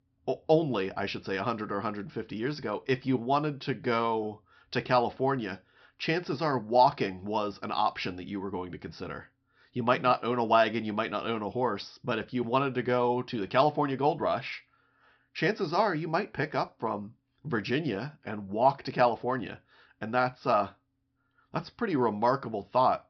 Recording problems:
high frequencies cut off; noticeable; nothing above 5.5 kHz

